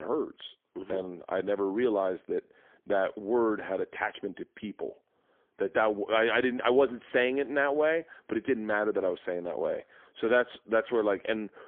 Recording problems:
phone-call audio; poor line; nothing above 3.5 kHz
abrupt cut into speech; at the start

